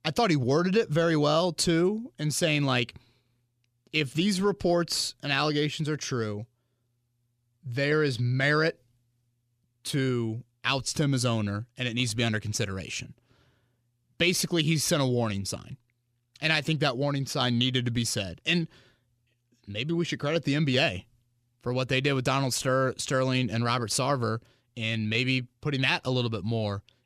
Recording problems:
none

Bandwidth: 14.5 kHz